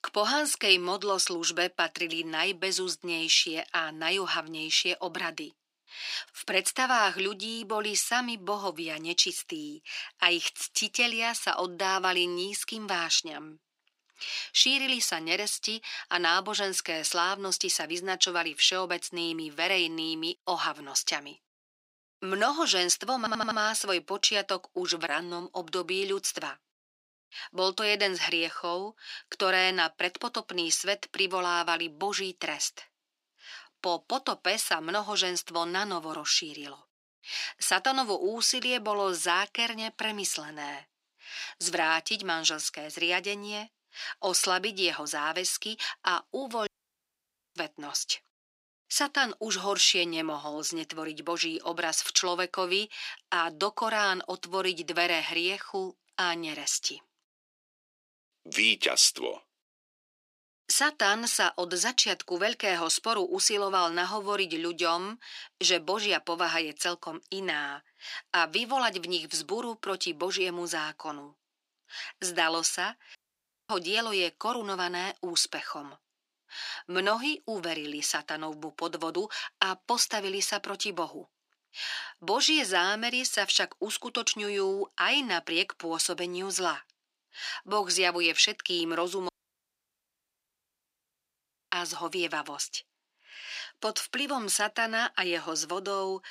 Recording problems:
thin; very; fading below 350 Hz
audio stuttering; at 23 s
audio cutting out; at 47 s for 1 s, at 1:13 for 0.5 s and at 1:29 for 2.5 s

